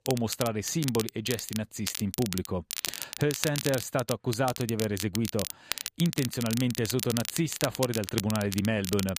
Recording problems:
crackle, like an old record; loud; 5 dB below the speech

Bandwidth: 15 kHz